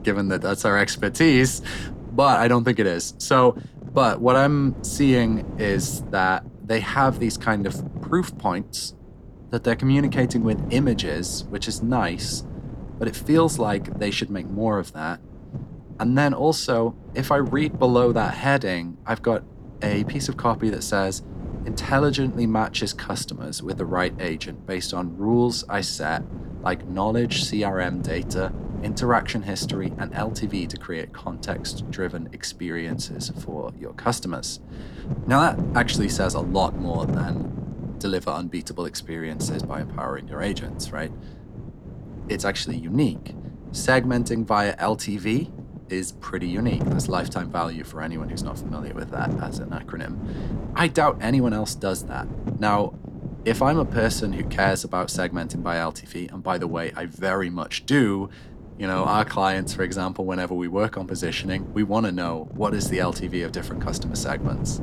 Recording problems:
wind noise on the microphone; occasional gusts; 15 dB below the speech

